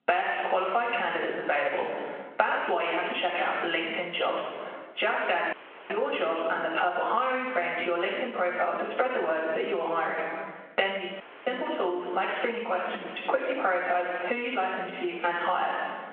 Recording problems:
room echo; strong; dies away in 1 s
off-mic speech; far
phone-call audio
squashed, flat; somewhat
audio cutting out; at 5.5 s and at 11 s

